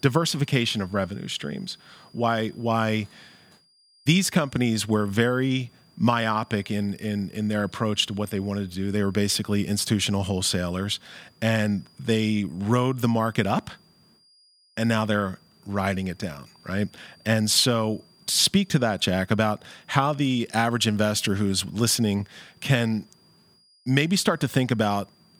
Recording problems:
high-pitched whine; faint; throughout; 4.5 kHz, 30 dB below the speech

